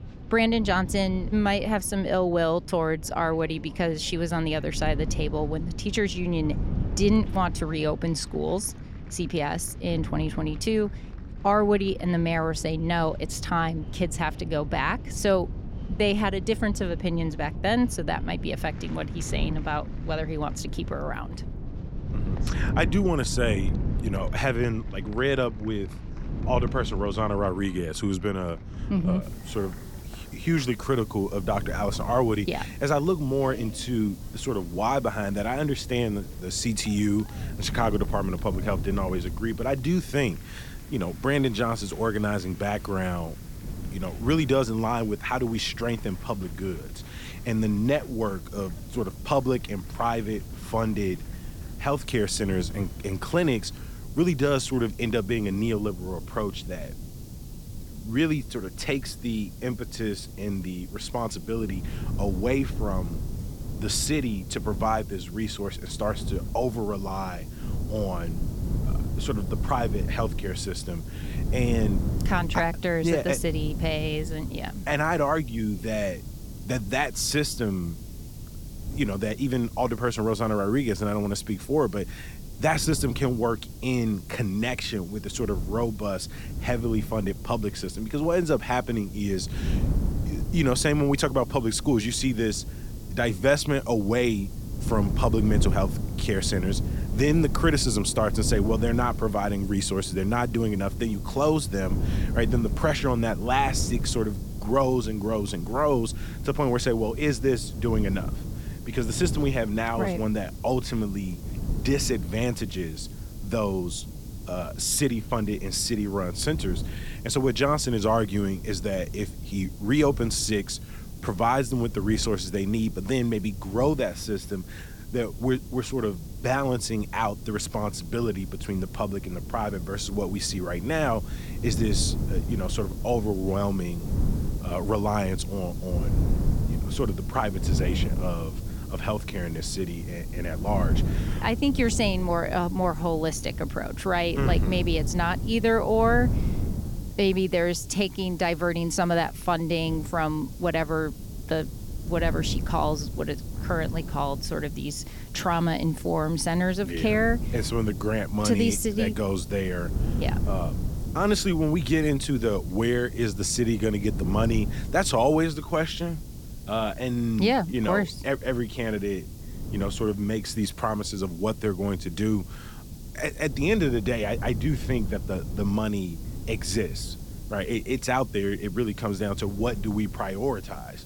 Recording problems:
wind noise on the microphone; occasional gusts; 15 dB below the speech
crowd noise; faint; until 54 s; 25 dB below the speech
hiss; faint; from 29 s on; 20 dB below the speech

